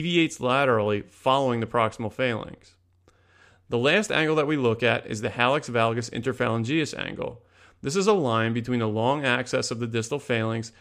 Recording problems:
abrupt cut into speech; at the start

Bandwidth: 14.5 kHz